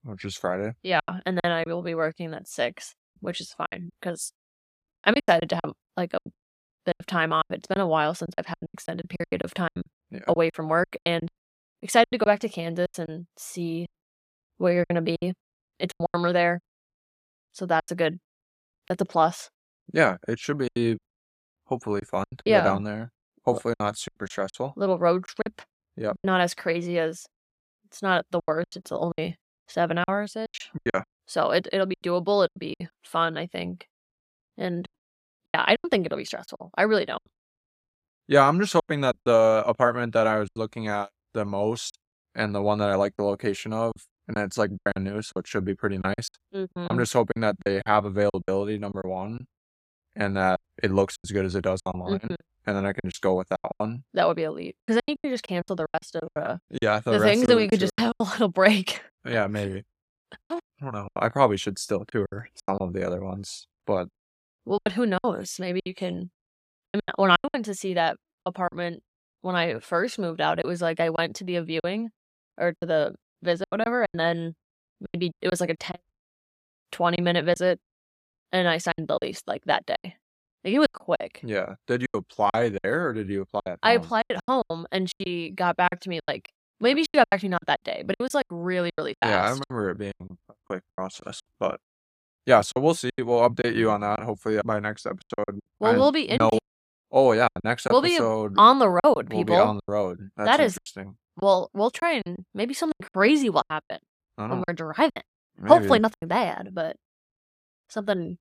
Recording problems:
choppy; very; 13% of the speech affected

